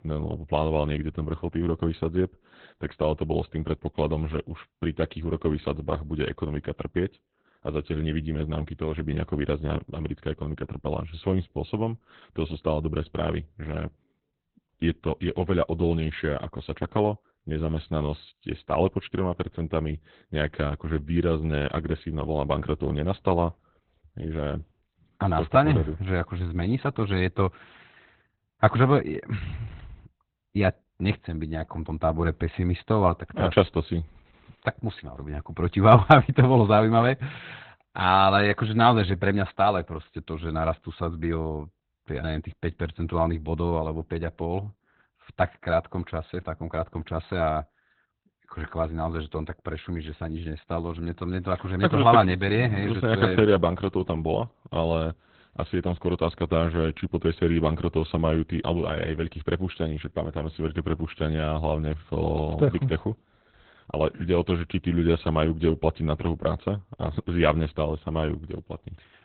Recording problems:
garbled, watery; badly; nothing above 4 kHz

